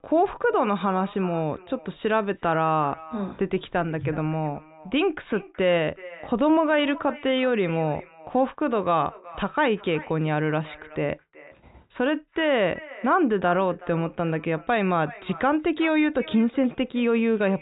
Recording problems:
high frequencies cut off; severe; nothing above 4 kHz
echo of what is said; faint; throughout; 370 ms later, 20 dB below the speech

